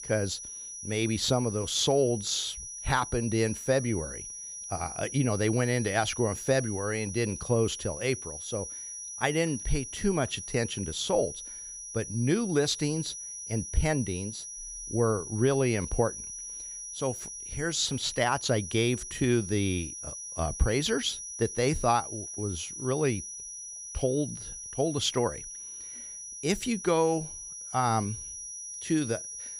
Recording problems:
high-pitched whine; loud; throughout; 6 kHz, 8 dB below the speech

